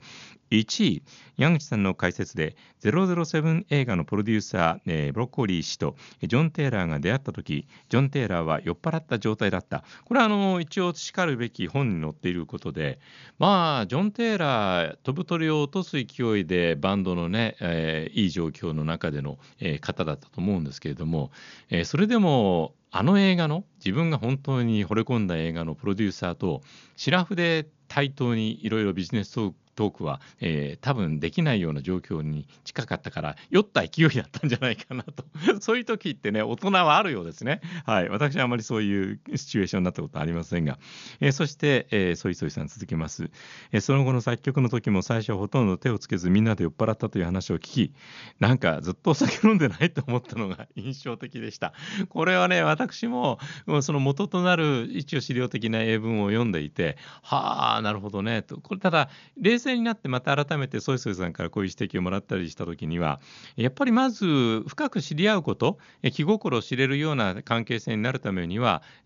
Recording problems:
high frequencies cut off; noticeable; nothing above 7 kHz

